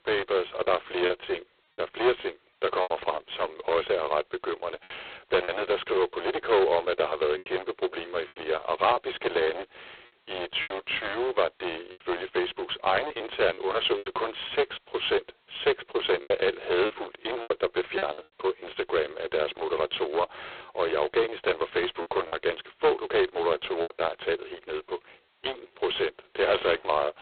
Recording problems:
phone-call audio; poor line; nothing above 4 kHz
distortion; heavy; 9% of the sound clipped
choppy; very; 5% of the speech affected

